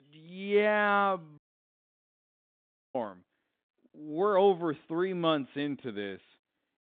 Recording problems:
phone-call audio
audio cutting out; at 1.5 s for 1.5 s

